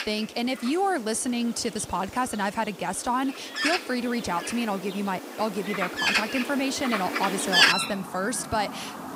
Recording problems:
animal sounds; very loud; throughout; 2 dB above the speech

